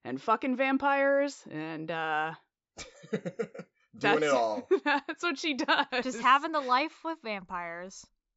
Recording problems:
high frequencies cut off; noticeable; nothing above 8 kHz

